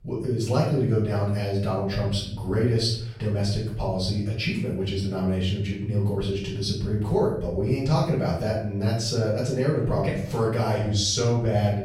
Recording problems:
off-mic speech; far
room echo; noticeable; dies away in 0.7 s

